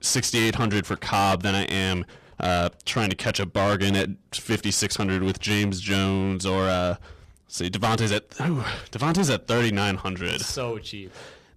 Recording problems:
distortion; heavy; 11% of the sound clipped

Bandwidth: 14.5 kHz